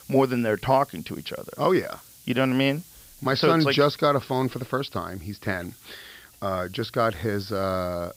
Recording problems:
high frequencies cut off; noticeable; nothing above 5.5 kHz
hiss; faint; throughout; 25 dB below the speech

